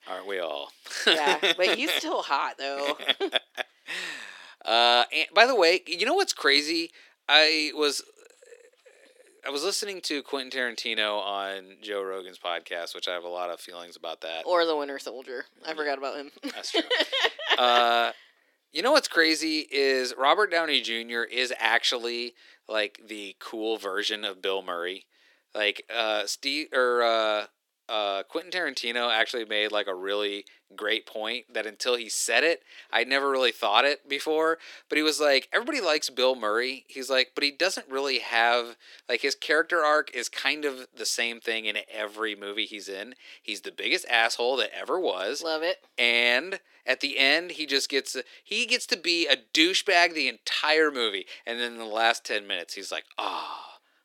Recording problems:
thin; somewhat; fading below 300 Hz

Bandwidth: 17 kHz